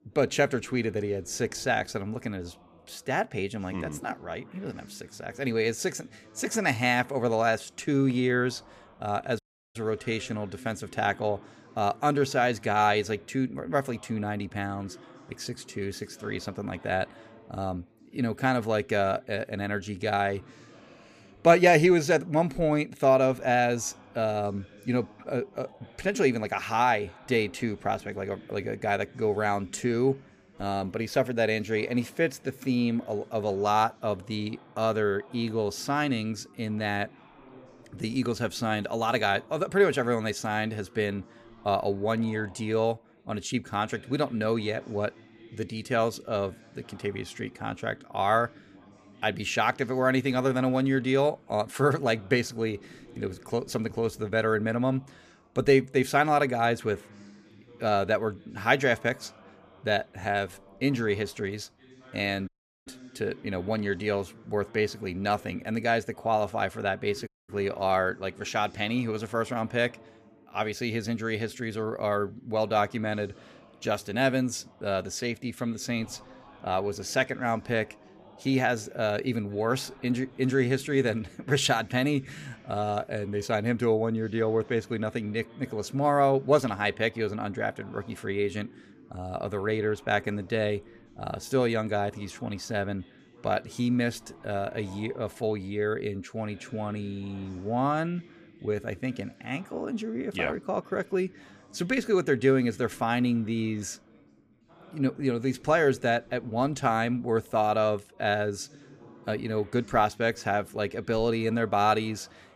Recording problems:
background chatter; faint; throughout; 2 voices, 25 dB below the speech
audio cutting out; at 9.5 s, at 1:02 and at 1:07

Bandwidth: 15 kHz